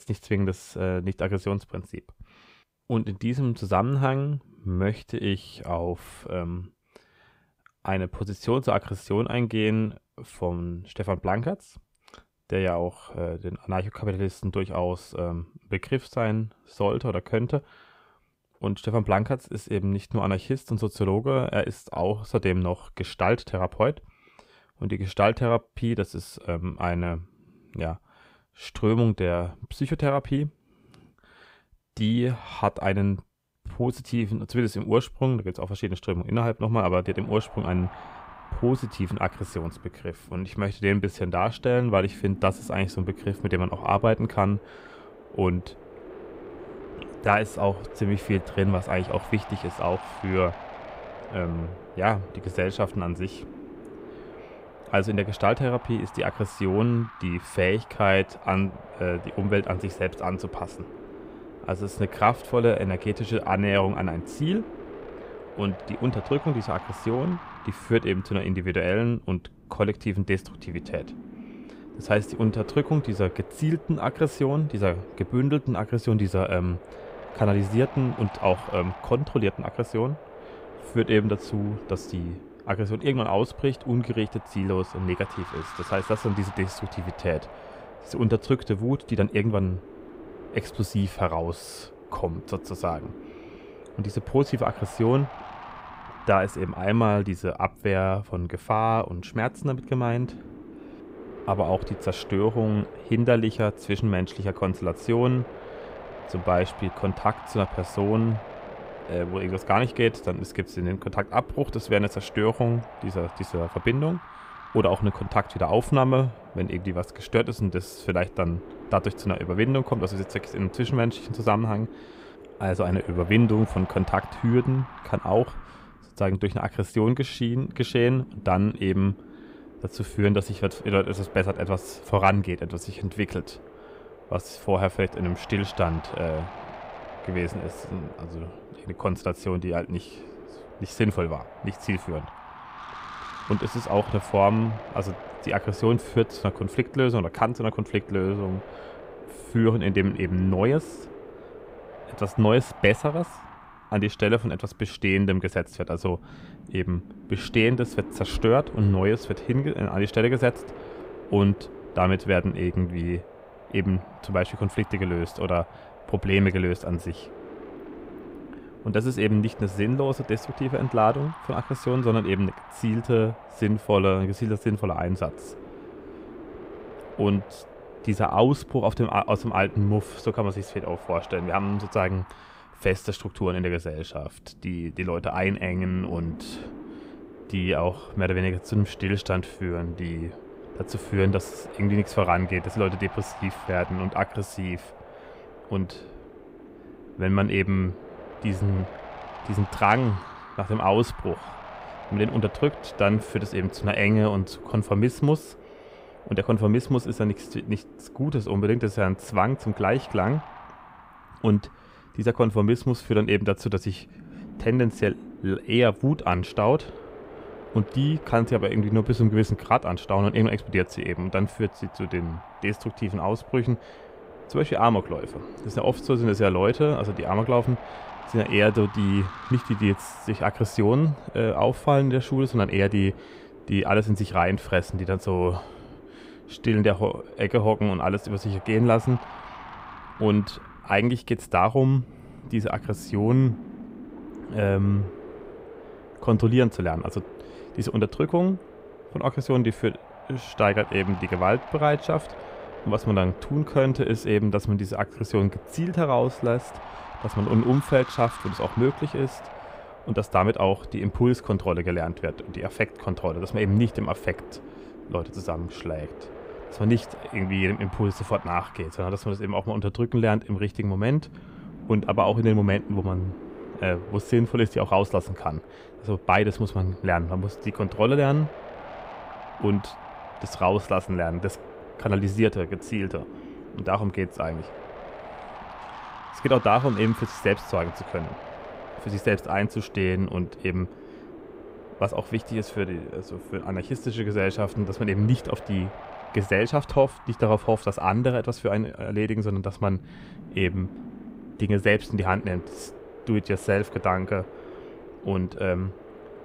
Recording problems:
wind noise on the microphone; occasional gusts; from 37 s on; 15 dB below the speech

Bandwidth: 15.5 kHz